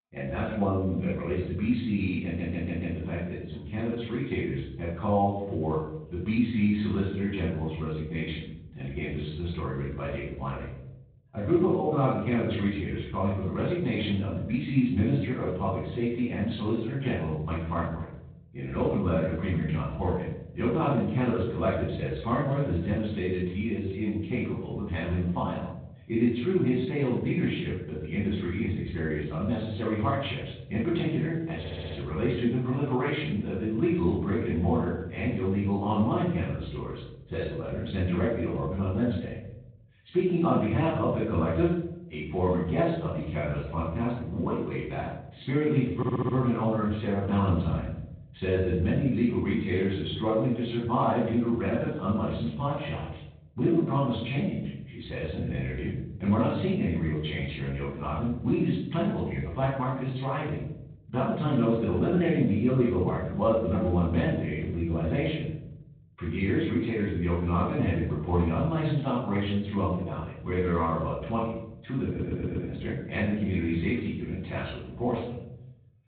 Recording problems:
off-mic speech; far
high frequencies cut off; severe; nothing above 4 kHz
room echo; noticeable; dies away in 0.9 s
garbled, watery; slightly
audio stuttering; 4 times, first at 2.5 s

